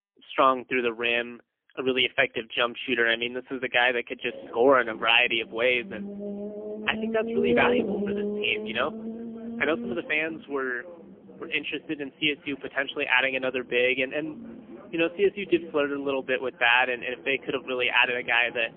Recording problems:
phone-call audio; poor line; nothing above 3 kHz
traffic noise; noticeable; from 4.5 s on; 10 dB below the speech

